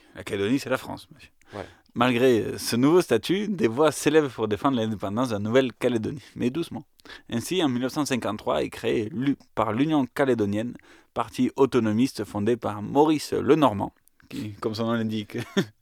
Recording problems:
none

